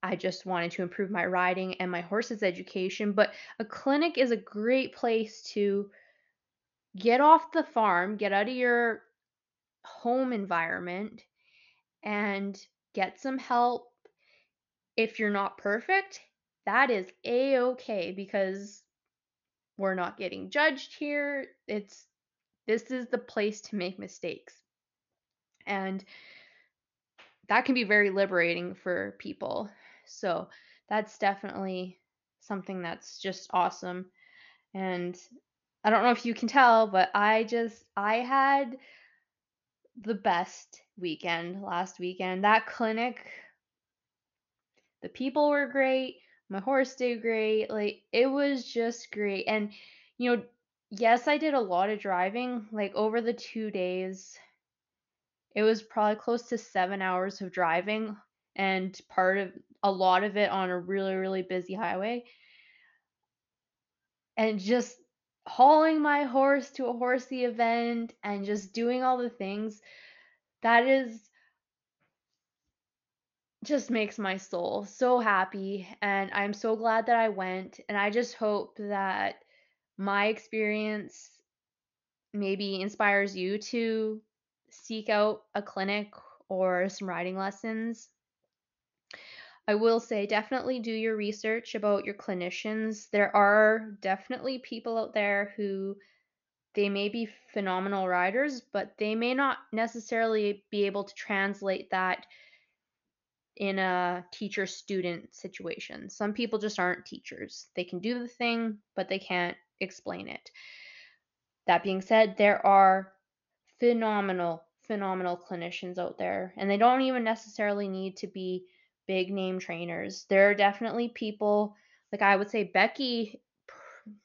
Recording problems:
high frequencies cut off; noticeable; nothing above 7 kHz

